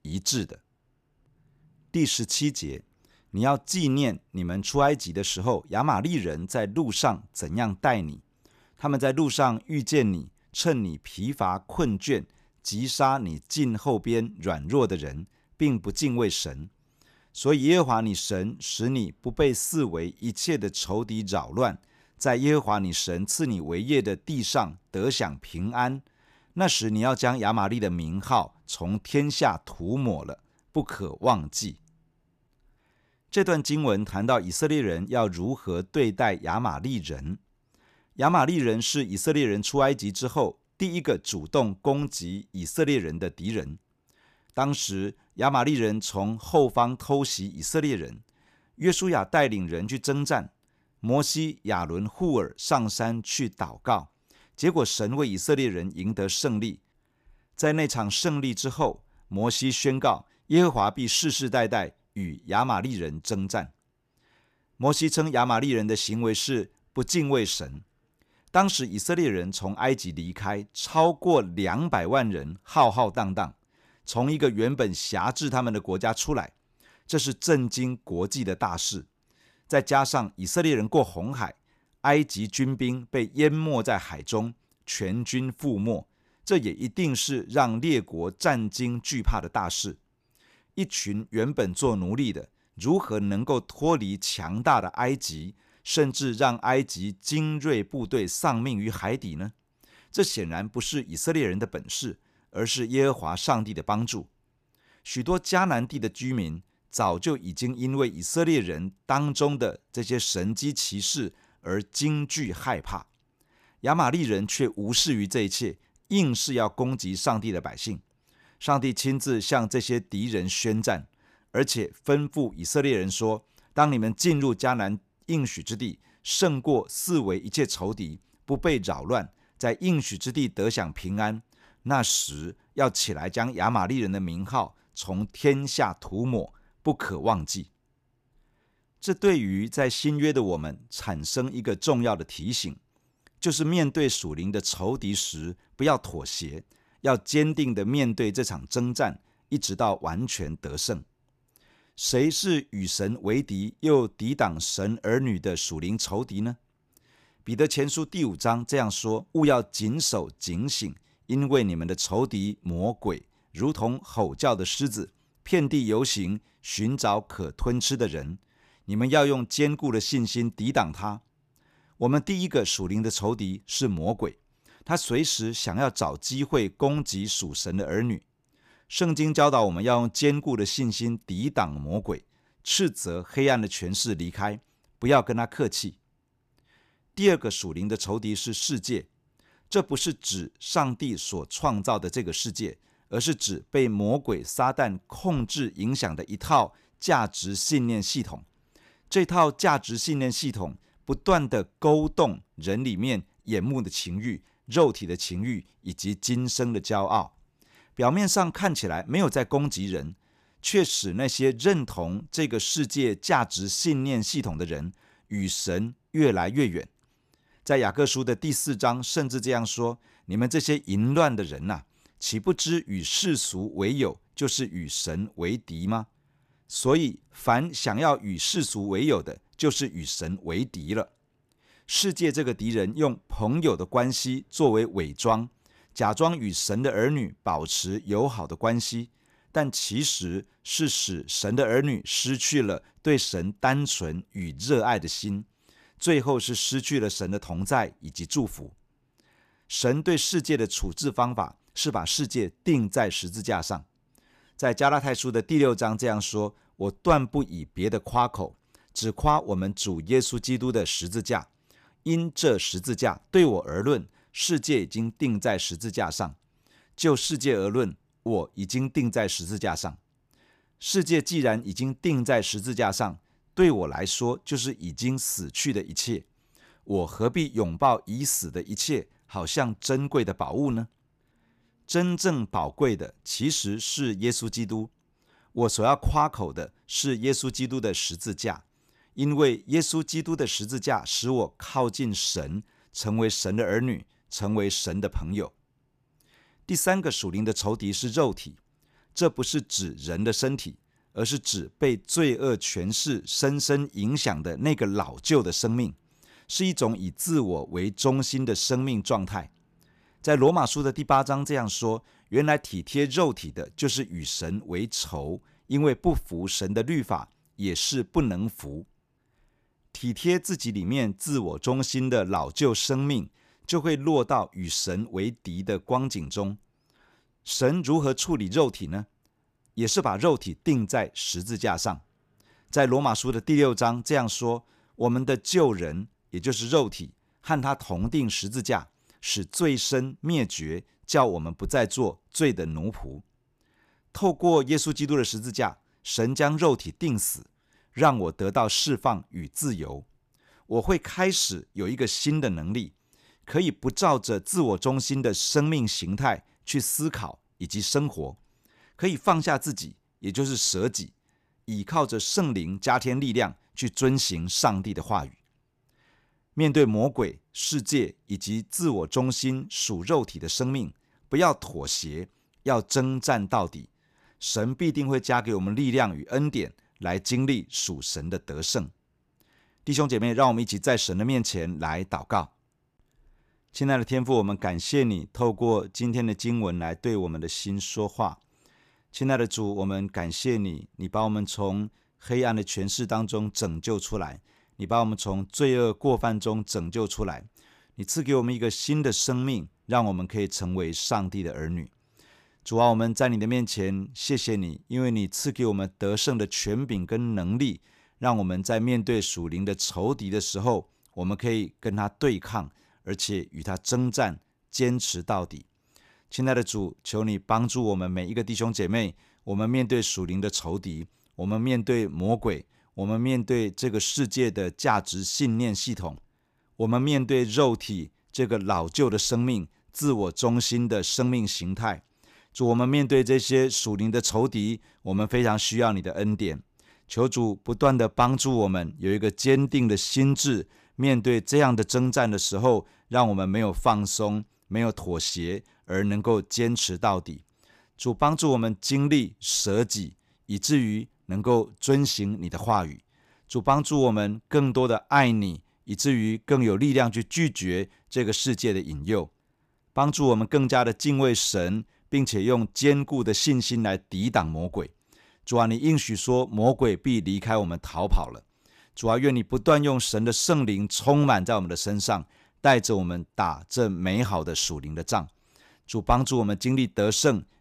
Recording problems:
none

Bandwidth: 14.5 kHz